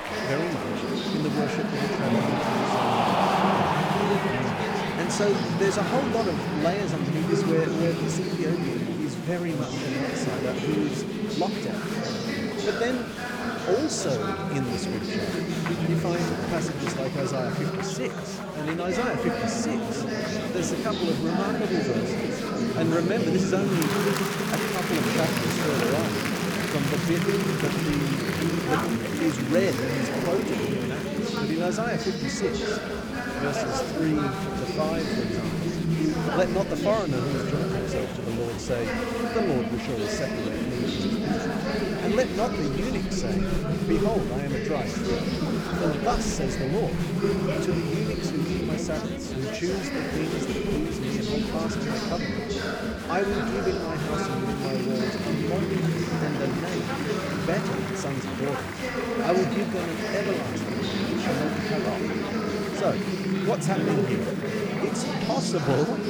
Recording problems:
chatter from many people; very loud; throughout; 3 dB above the speech

